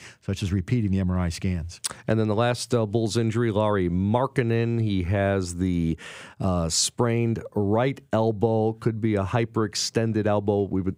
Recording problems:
none

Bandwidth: 15.5 kHz